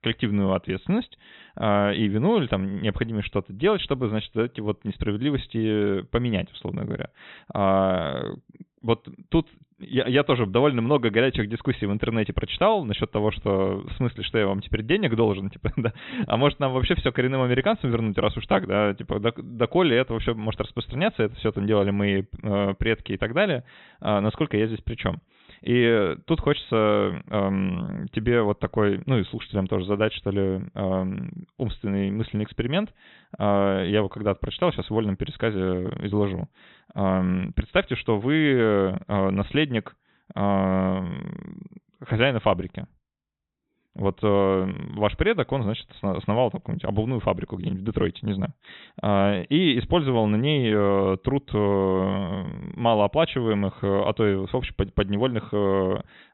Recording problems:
high frequencies cut off; severe; nothing above 4 kHz

